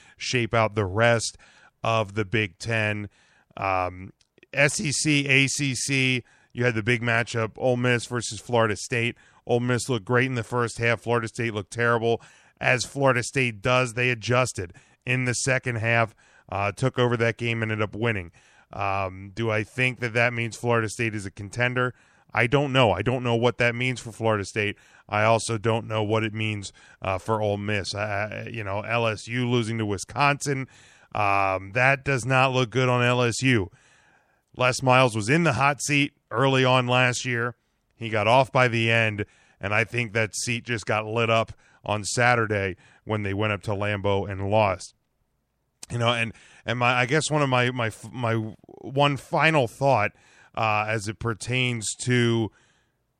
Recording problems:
none

